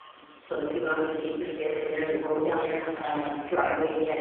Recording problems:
phone-call audio; poor line
off-mic speech; far
room echo; noticeable; dies away in 1.7 s
train or aircraft noise; faint; throughout; 25 dB below the speech
household noises; very faint; from 1 s on; 20 dB below the speech
audio freezing; at 1.5 s

